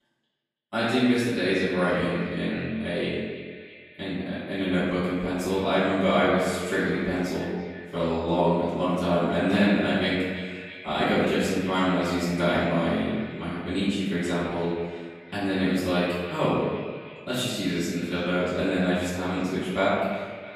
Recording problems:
room echo; strong; dies away in 1.2 s
off-mic speech; far
echo of what is said; noticeable; throughout; 330 ms later, 15 dB below the speech

